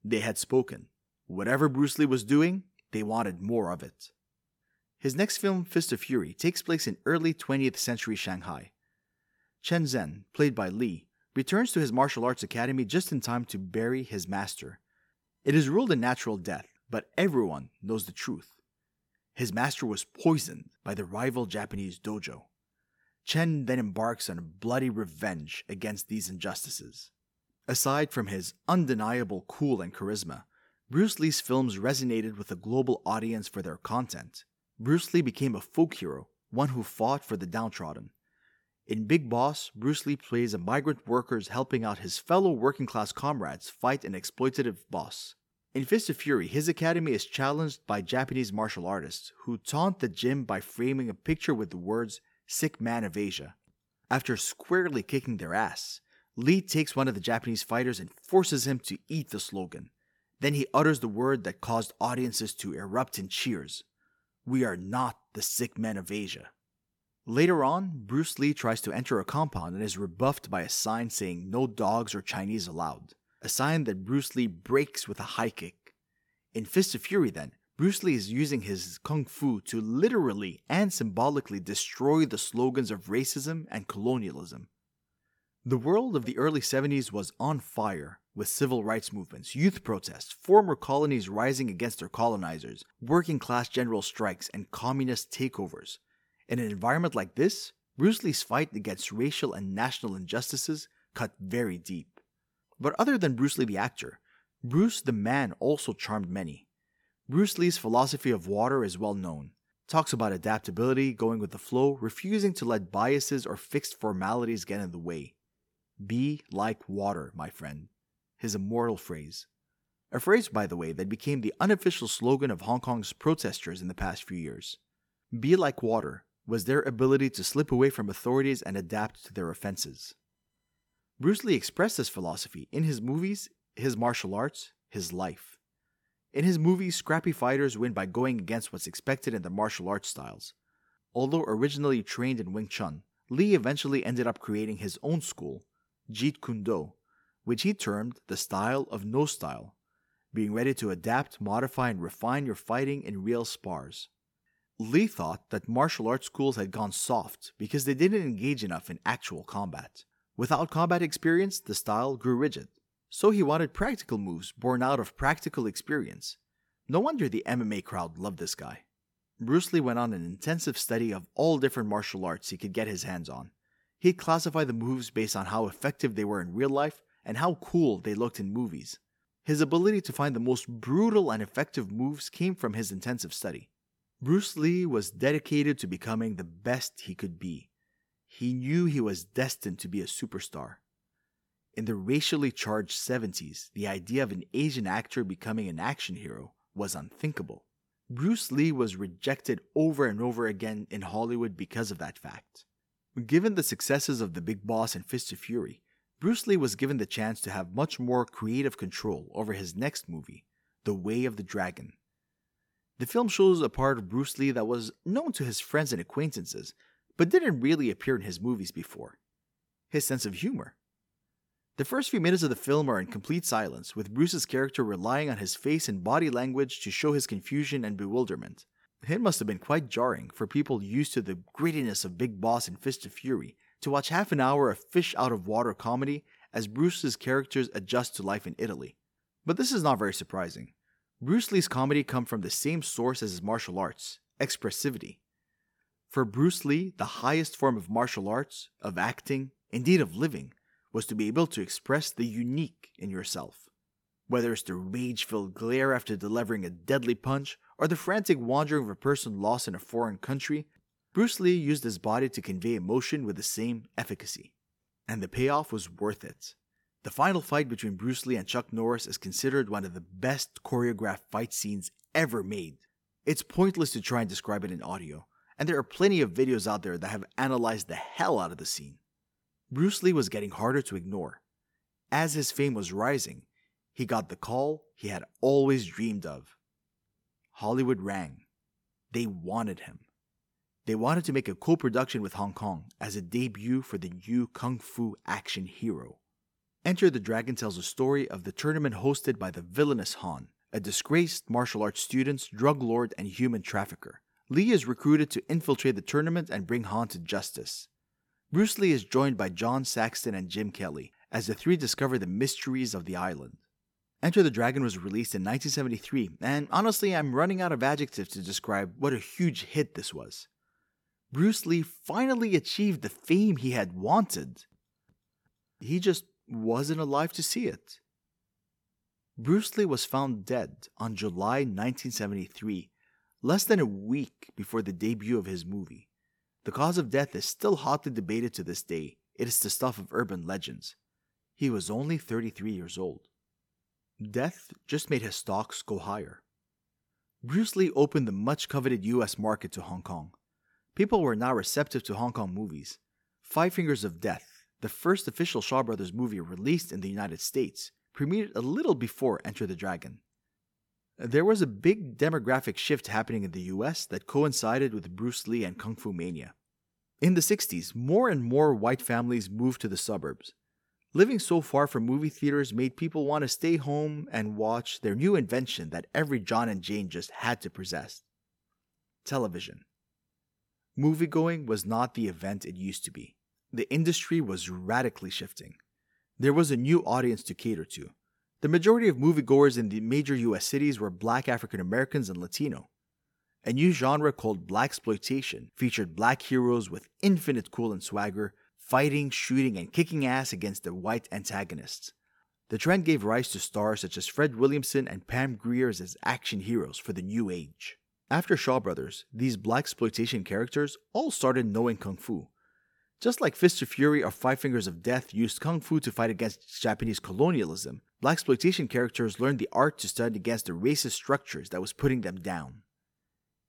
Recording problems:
none

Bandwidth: 18 kHz